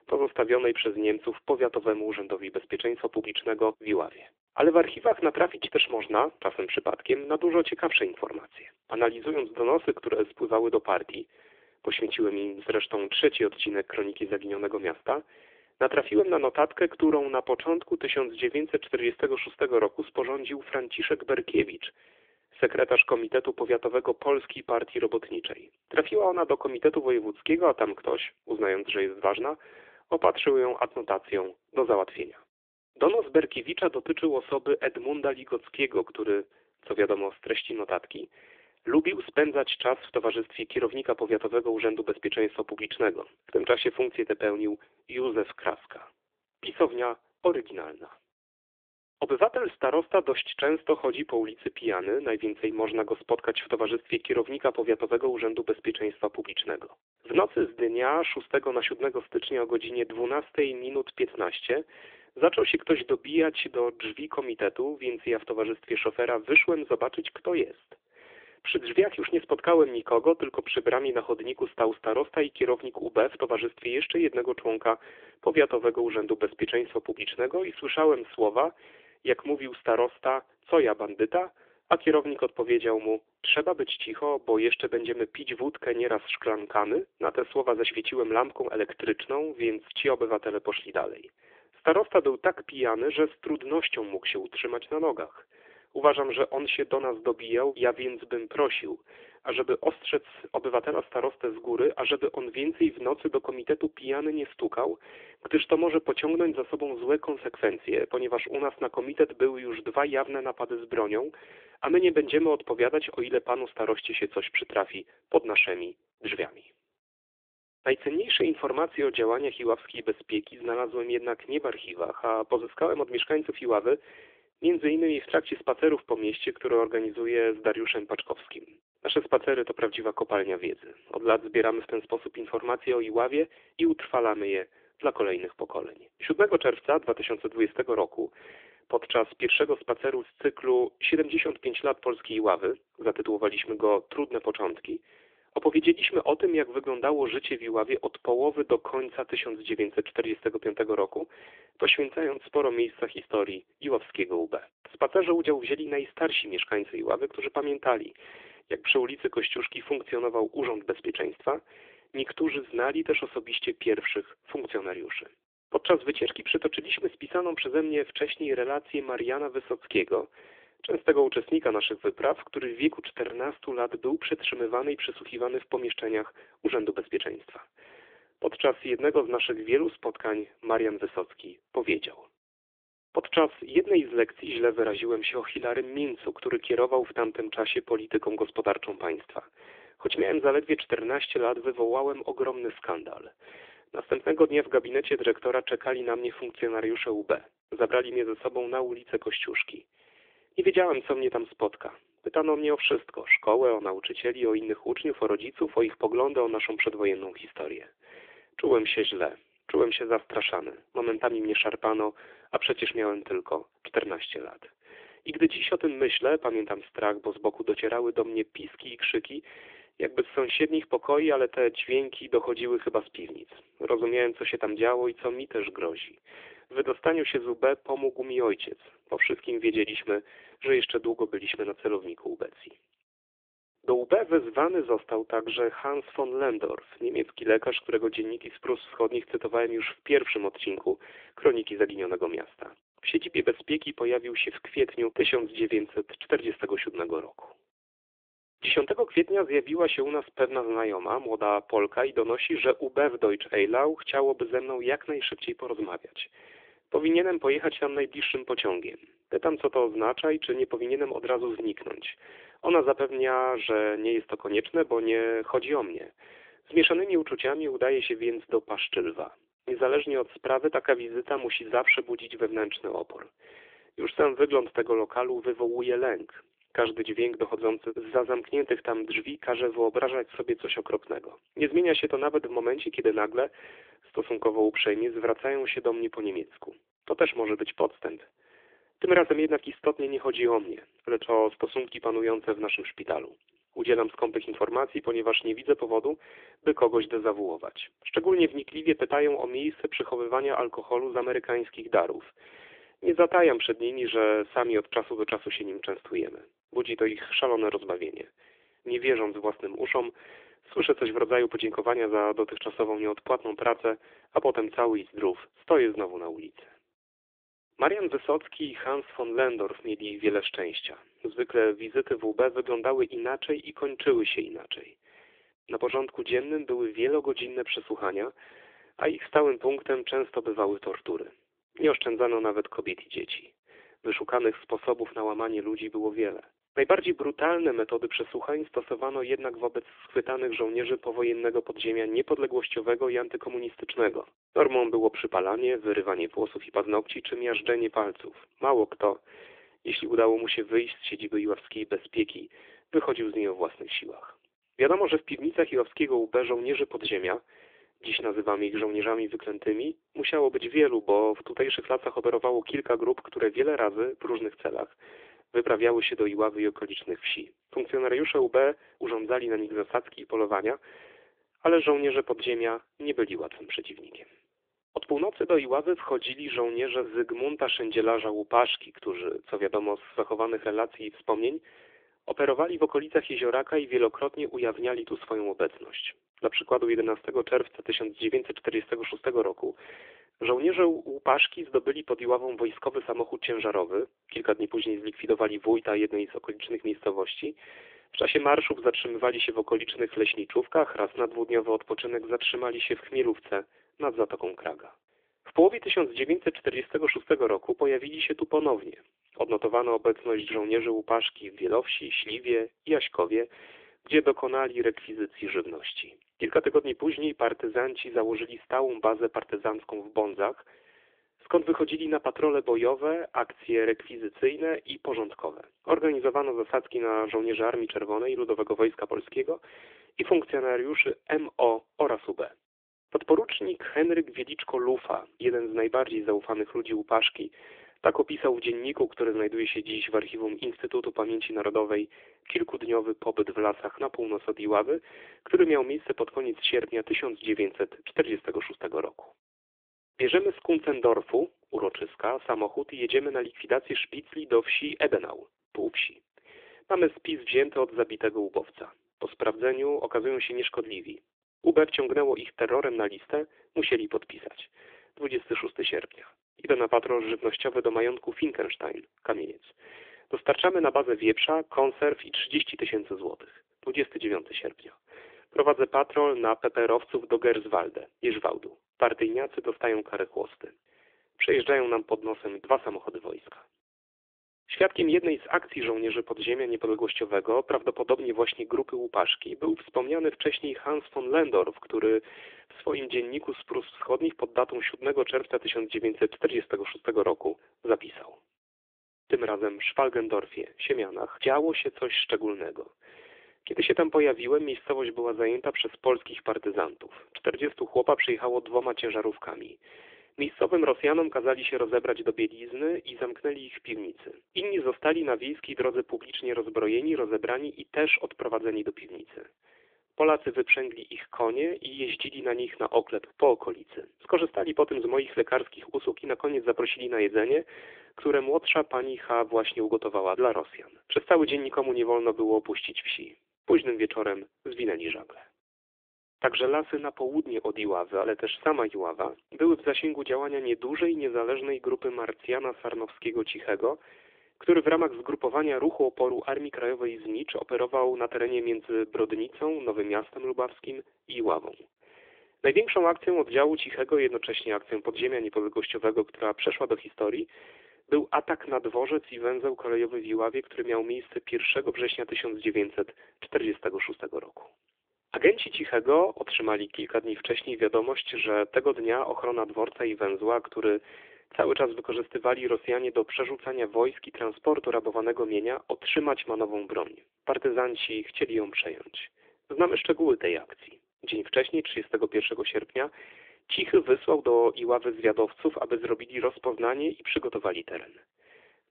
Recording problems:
phone-call audio; nothing above 3.5 kHz

